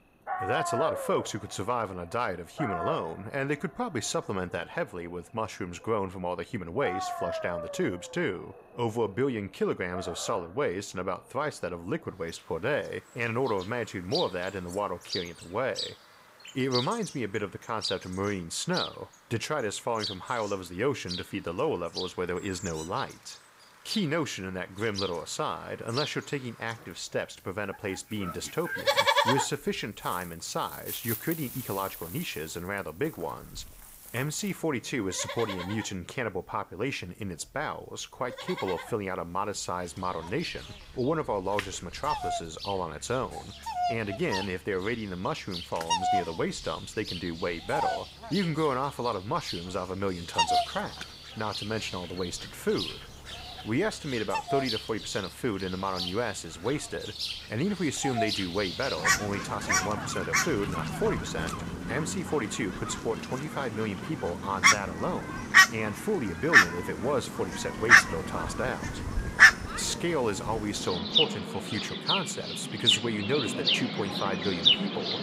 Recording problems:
animal sounds; very loud; throughout; 4 dB above the speech

